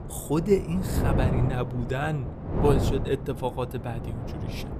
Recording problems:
wind noise on the microphone; heavy; 6 dB below the speech

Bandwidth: 15 kHz